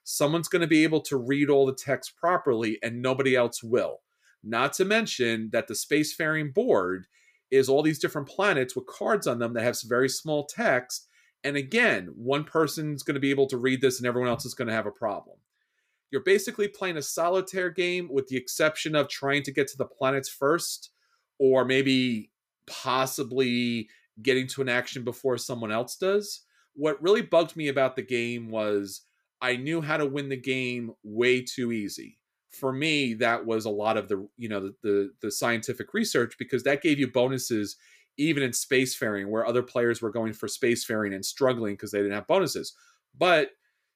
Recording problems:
none

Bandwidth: 15 kHz